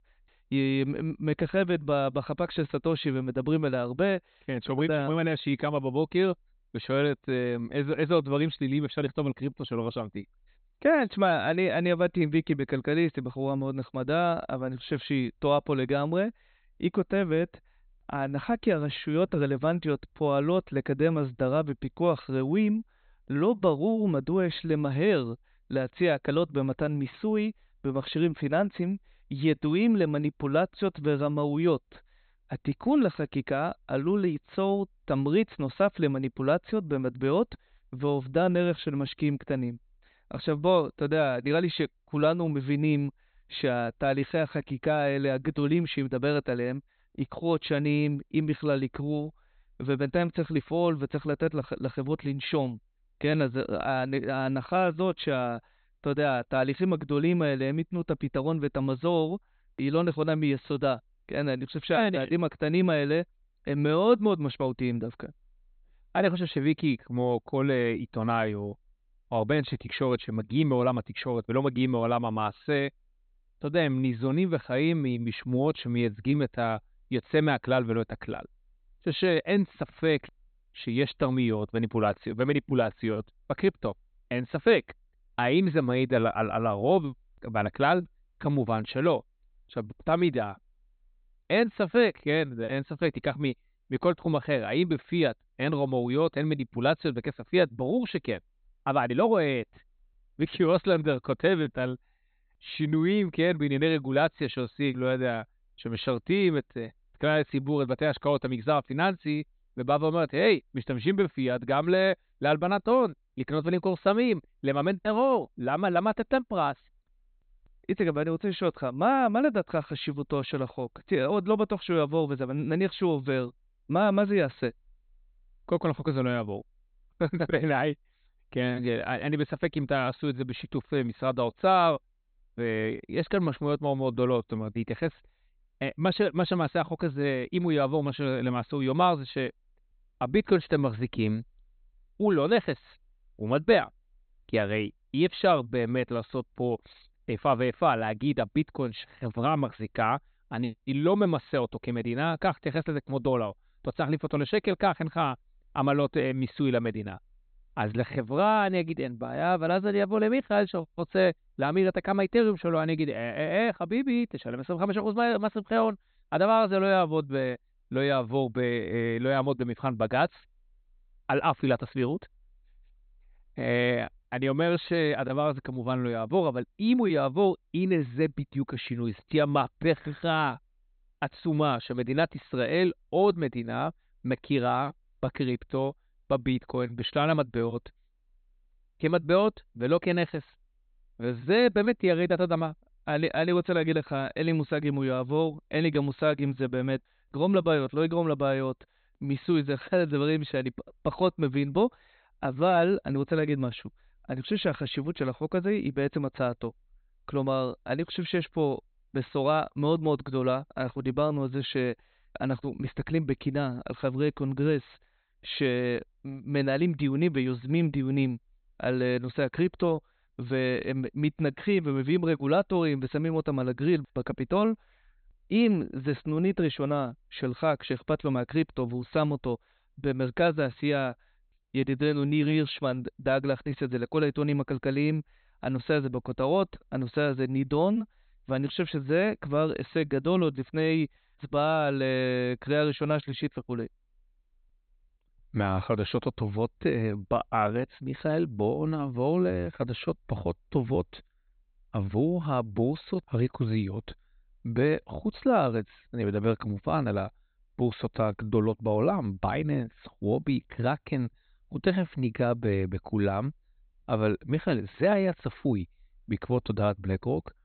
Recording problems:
high frequencies cut off; severe; nothing above 4 kHz

